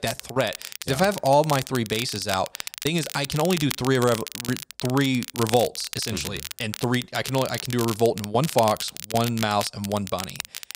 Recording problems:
crackle, like an old record; loud; 9 dB below the speech

